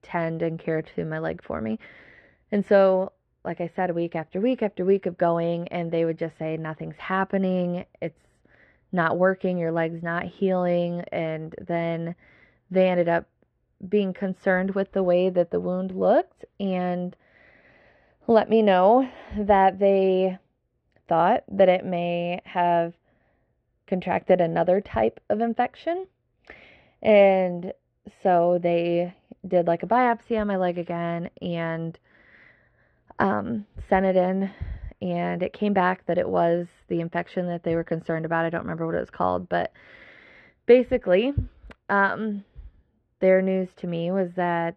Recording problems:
muffled; very; fading above 2.5 kHz

